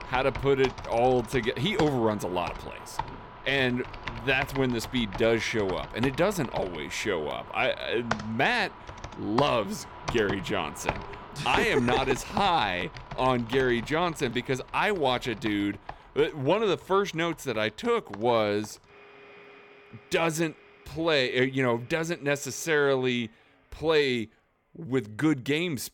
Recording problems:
household noises; noticeable; throughout; 10 dB below the speech

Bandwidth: 17.5 kHz